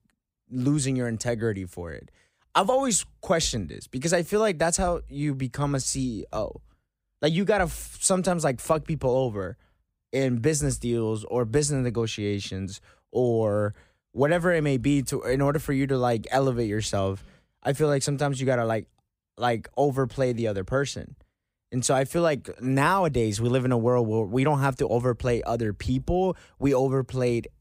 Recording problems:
none

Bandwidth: 15.5 kHz